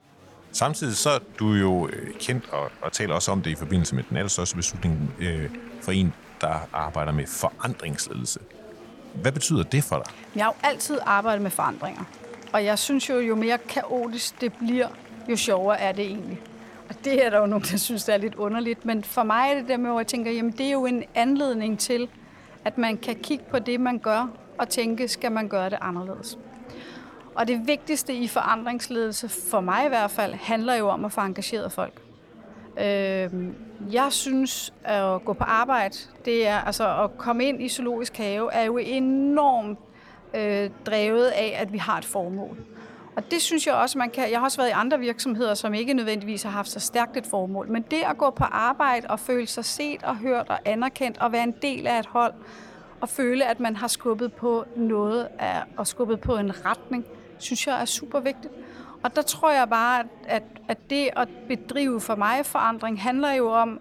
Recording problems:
murmuring crowd; faint; throughout; 20 dB below the speech

